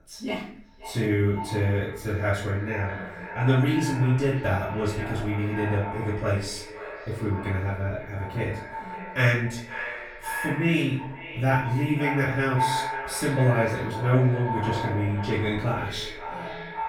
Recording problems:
echo of what is said; strong; throughout; 520 ms later, 9 dB below the speech
off-mic speech; far
room echo; noticeable; dies away in 0.5 s

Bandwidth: 18 kHz